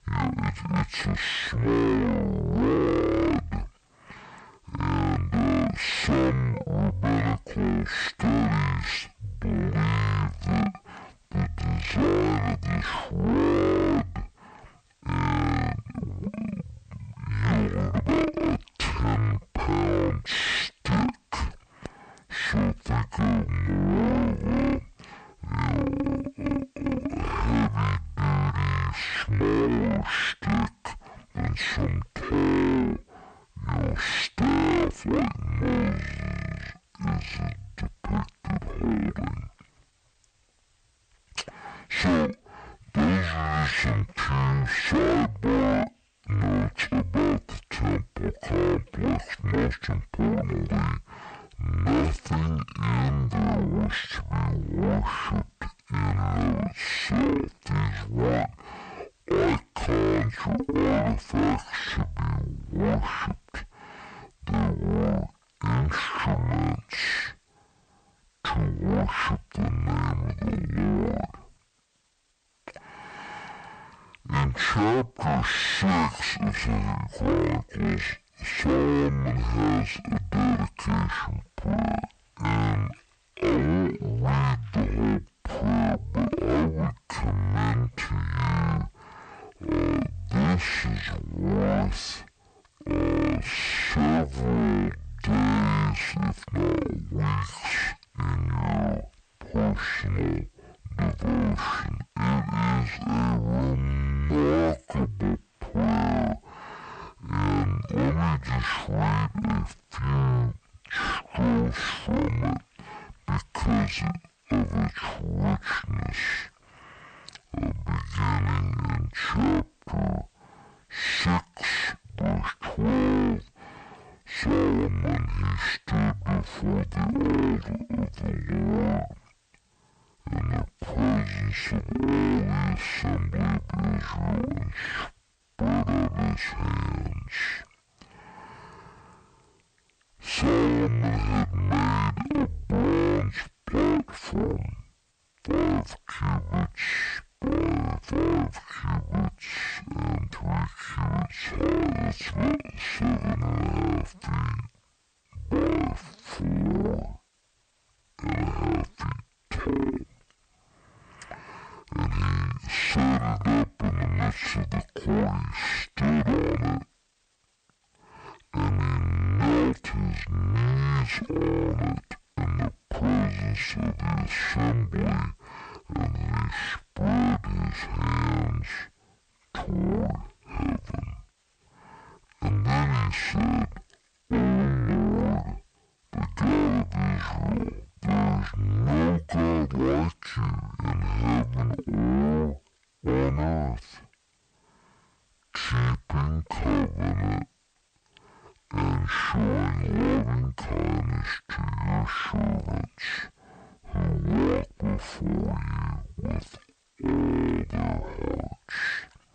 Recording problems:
distortion; heavy; 6 dB below the speech
wrong speed and pitch; too slow and too low; 0.5 times normal speed

